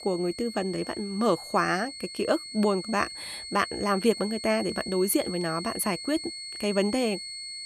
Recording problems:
high-pitched whine; loud; throughout; 4.5 kHz, 9 dB below the speech

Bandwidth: 14 kHz